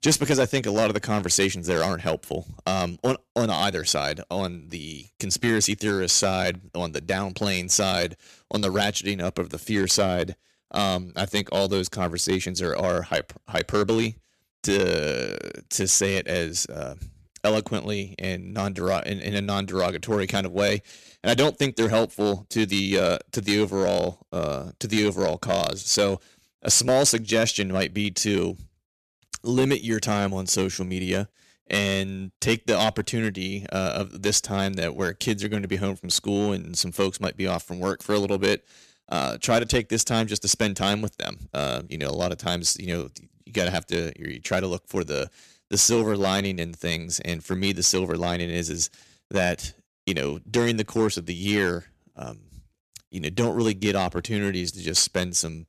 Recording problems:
distortion; slight; 3% of the sound clipped

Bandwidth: 14 kHz